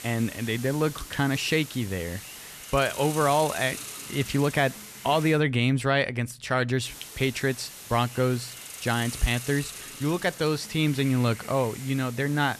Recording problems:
hiss; noticeable; until 5.5 s and from 7 s on; 10 dB below the speech

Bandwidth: 14 kHz